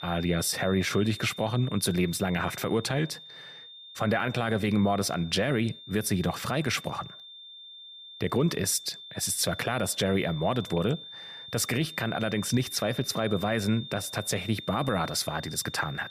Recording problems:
high-pitched whine; noticeable; throughout; 3.5 kHz, 15 dB below the speech

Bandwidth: 14.5 kHz